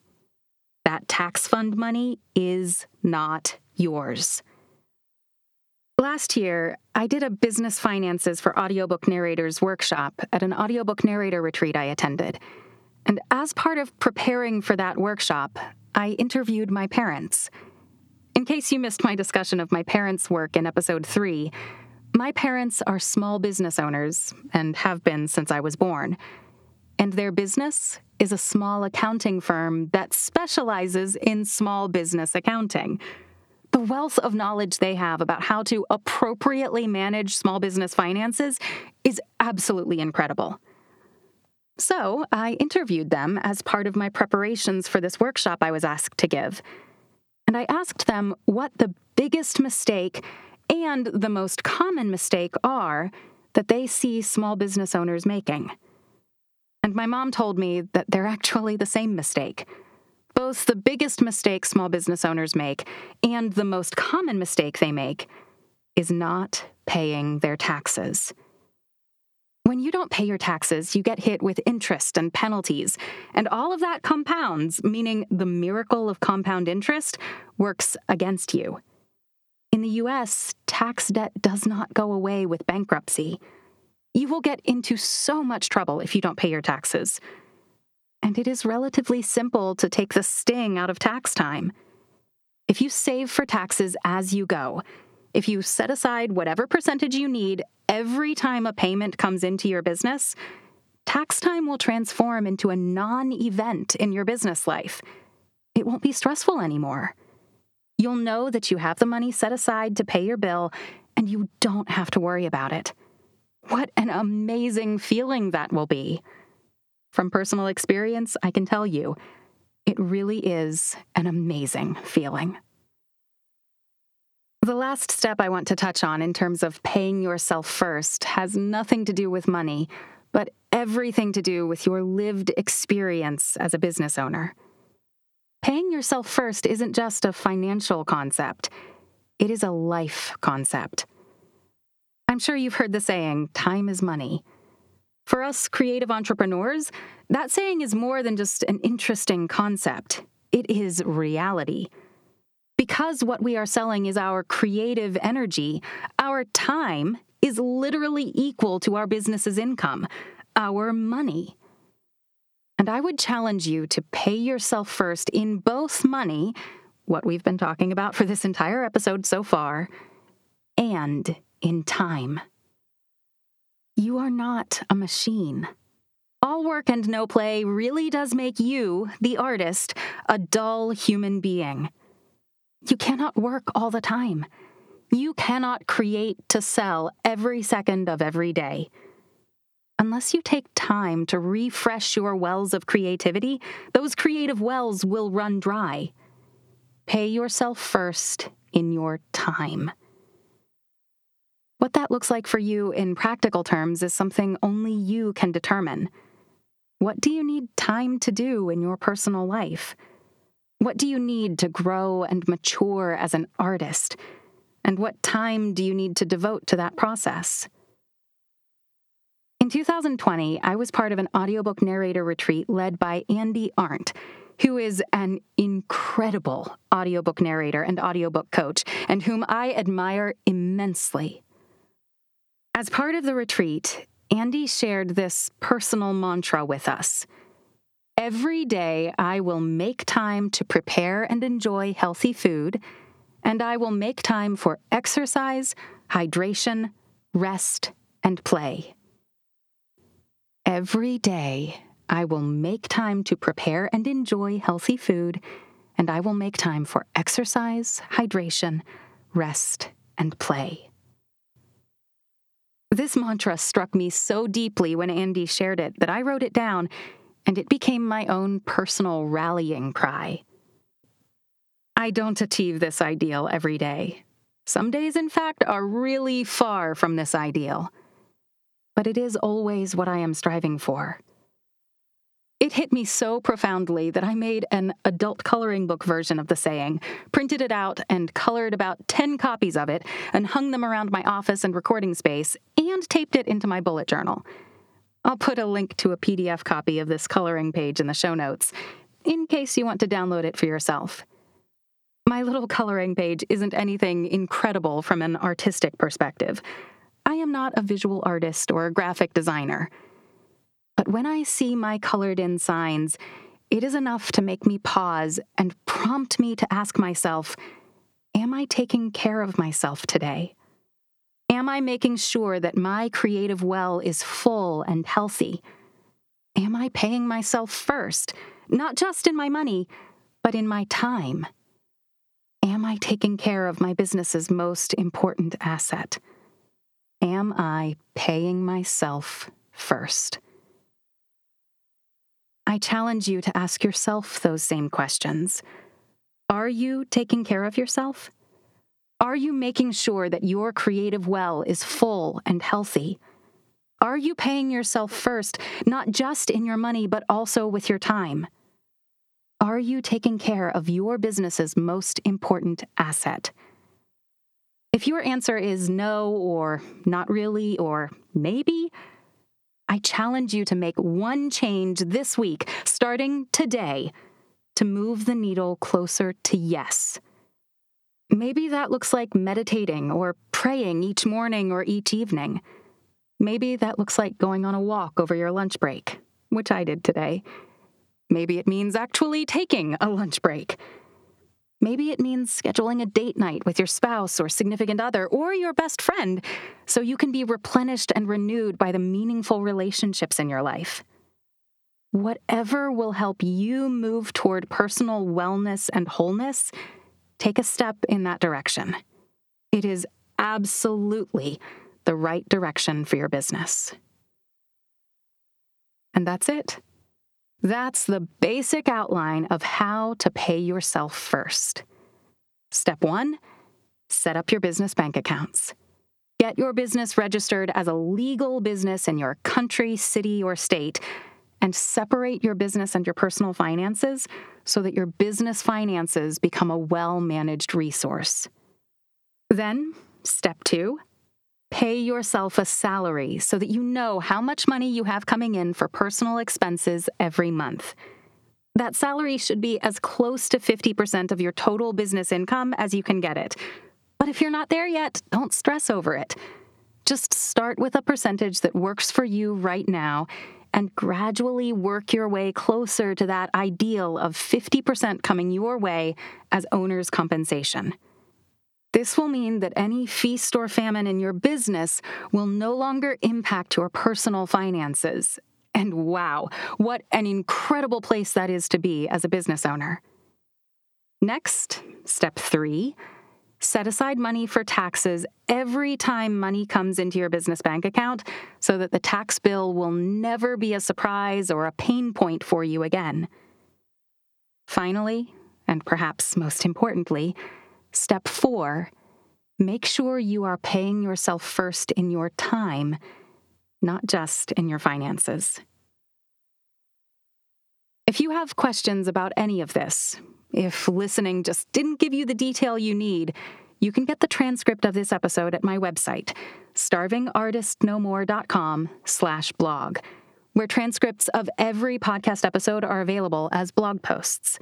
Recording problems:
squashed, flat; somewhat

